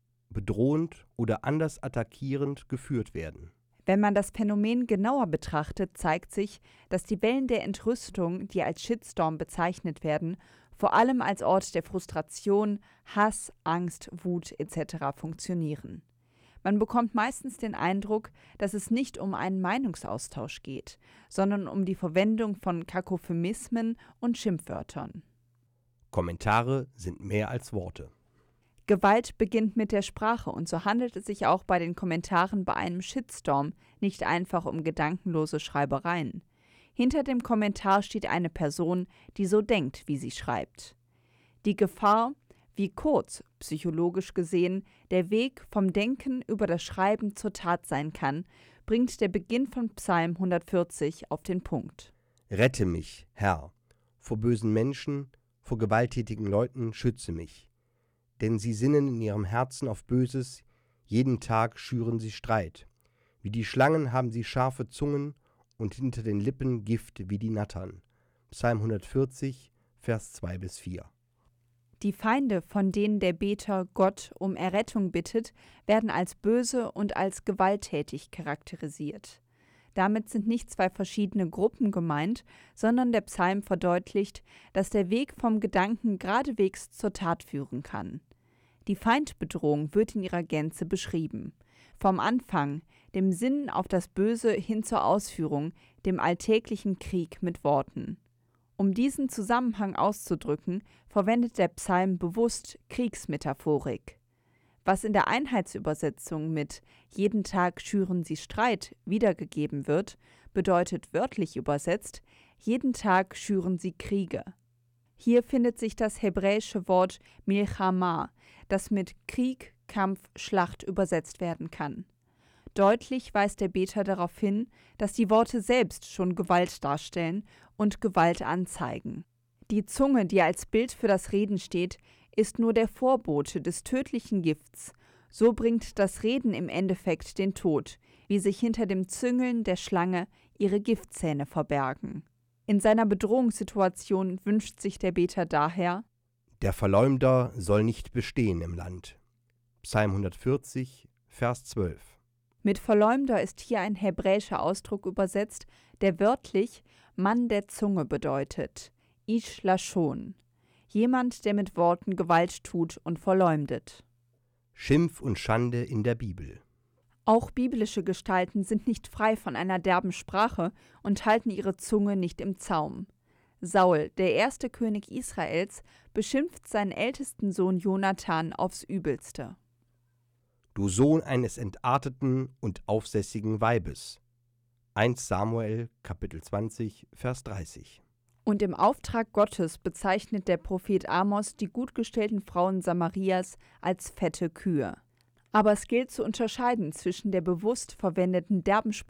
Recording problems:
none

